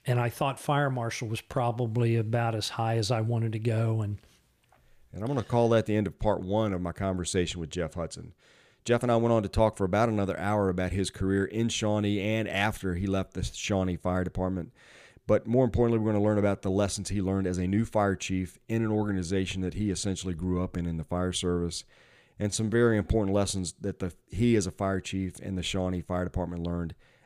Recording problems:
uneven, jittery; strongly; from 1.5 to 23 s

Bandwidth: 15 kHz